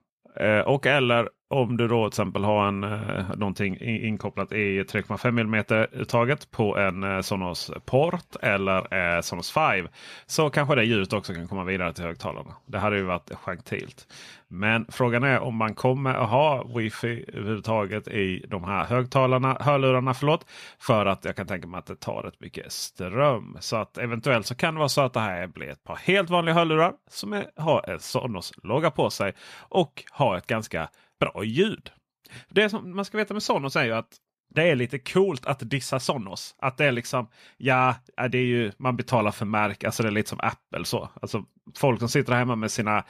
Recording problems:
none

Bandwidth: 15 kHz